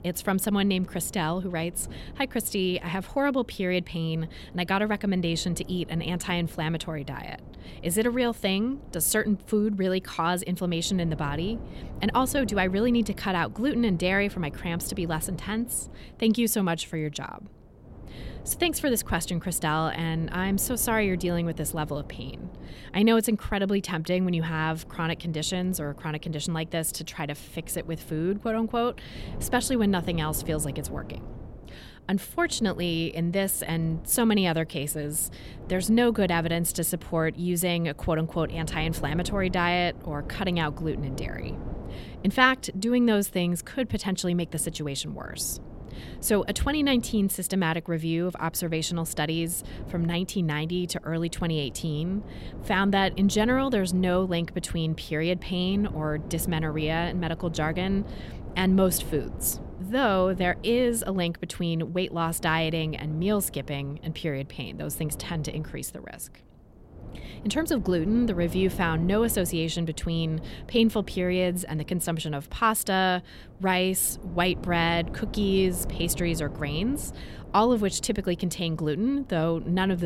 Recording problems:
wind noise on the microphone; occasional gusts; 20 dB below the speech
abrupt cut into speech; at the end

